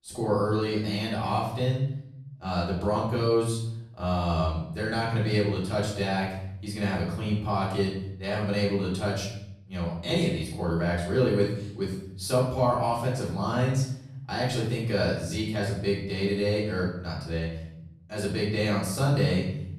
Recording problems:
off-mic speech; far
room echo; noticeable; dies away in 0.8 s

